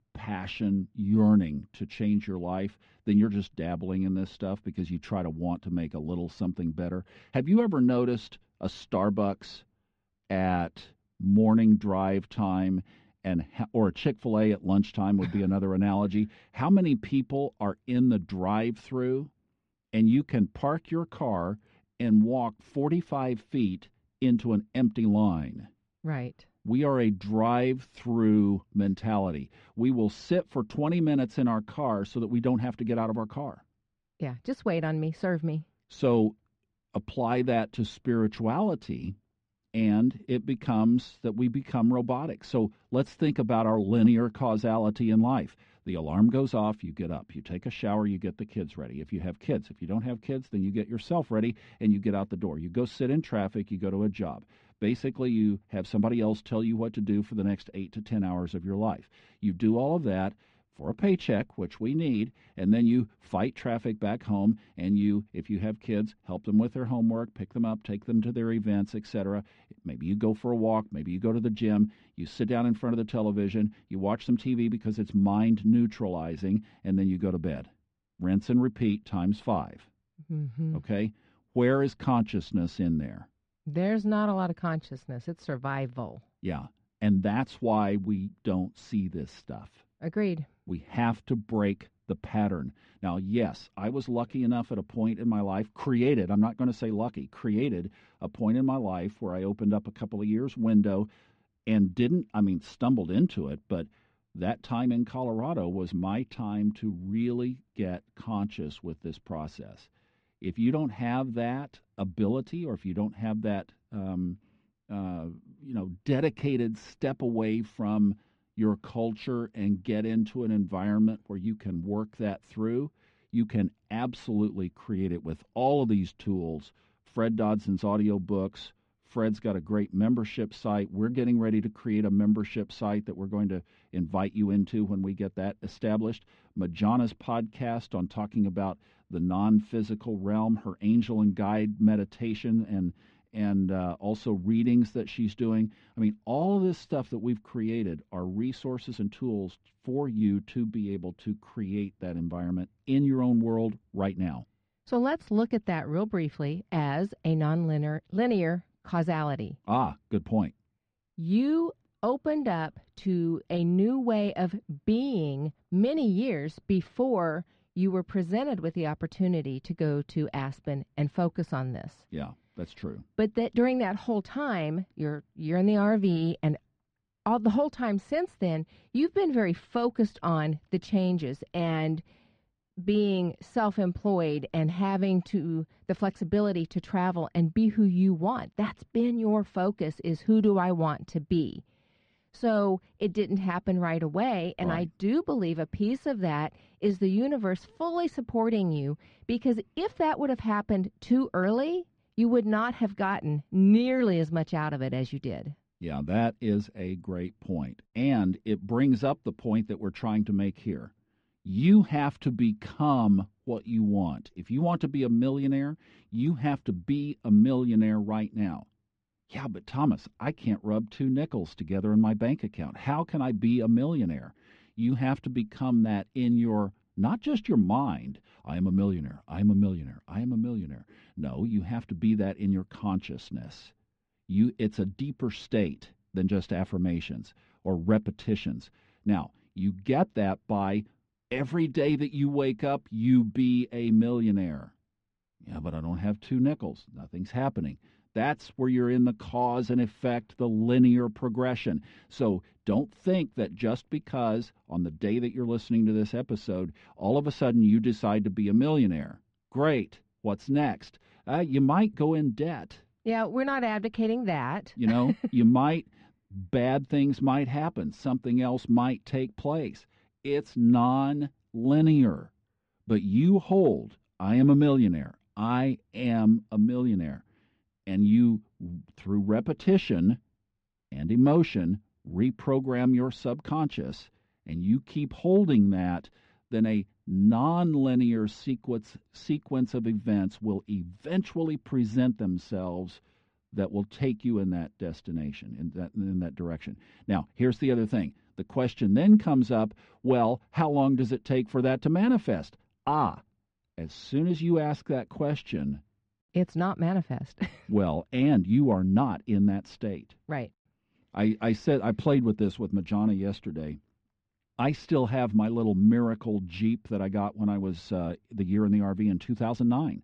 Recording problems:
muffled; very; fading above 2 kHz

